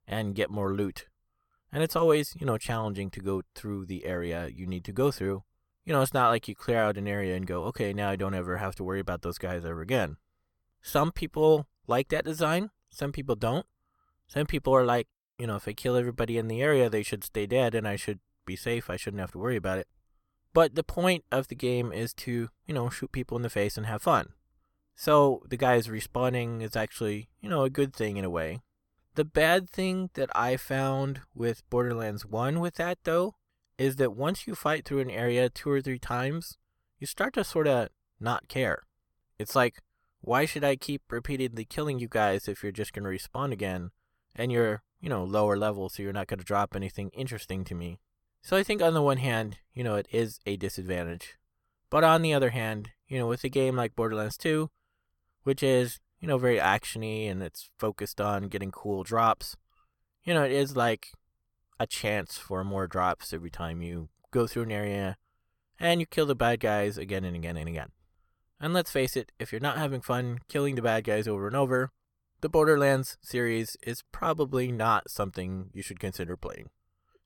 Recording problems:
none

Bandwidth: 18 kHz